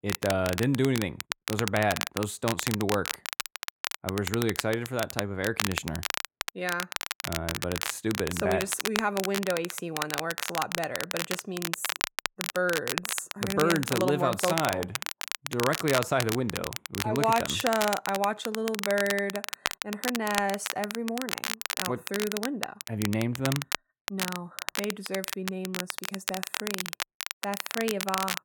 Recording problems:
crackle, like an old record; loud; 3 dB below the speech

